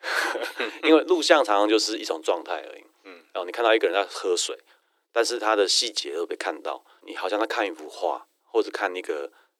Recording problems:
thin; very; fading below 300 Hz

